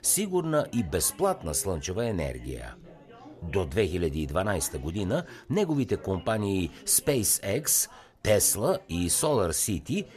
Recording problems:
chatter from many people; faint; throughout; 25 dB below the speech

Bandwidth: 13.5 kHz